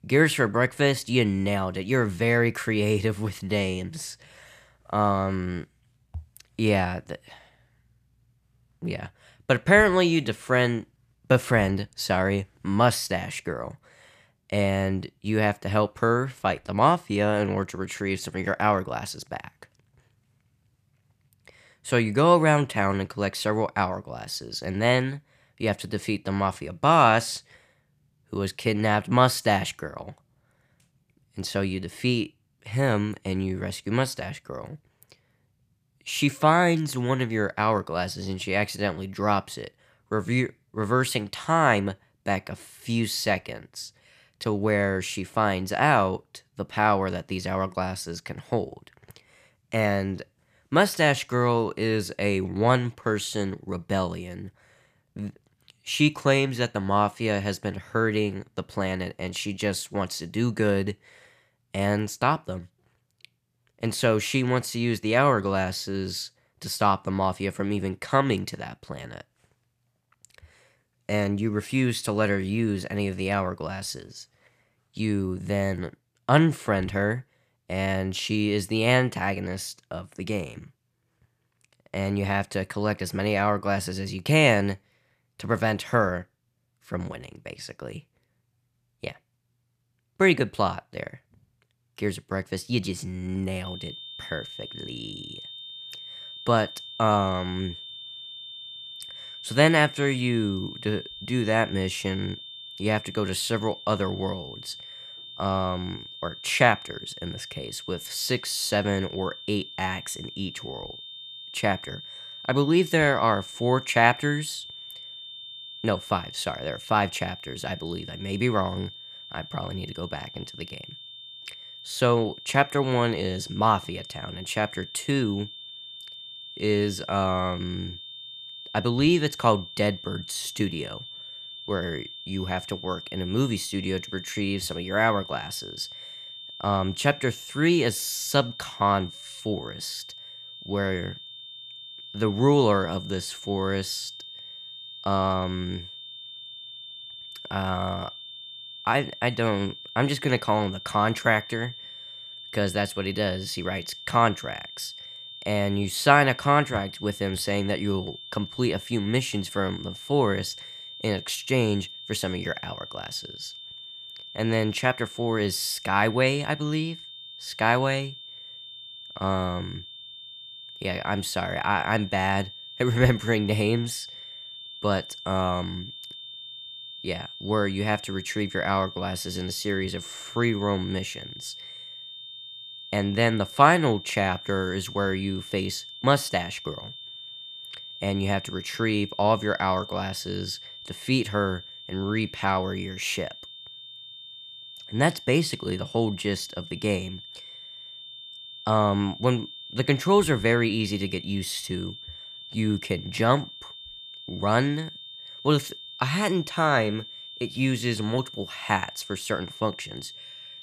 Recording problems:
high-pitched whine; noticeable; from 1:34 on; 3.5 kHz, 15 dB below the speech

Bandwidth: 14.5 kHz